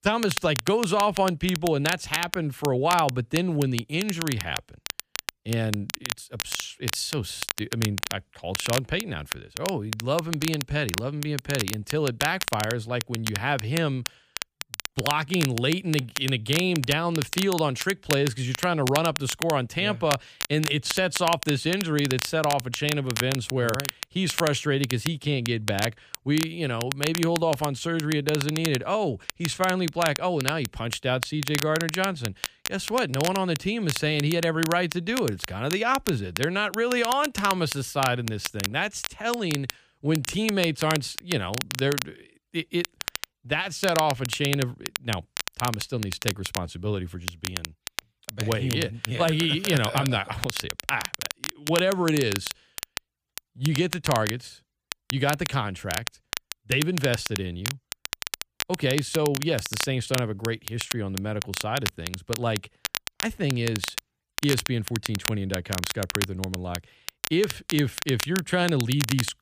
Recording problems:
crackle, like an old record; loud; 6 dB below the speech

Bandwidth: 15 kHz